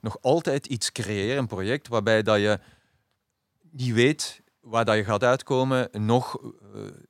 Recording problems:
none

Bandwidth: 16.5 kHz